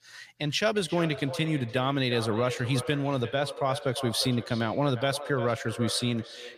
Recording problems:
echo of what is said; strong; throughout; 350 ms later, 10 dB below the speech

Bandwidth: 15 kHz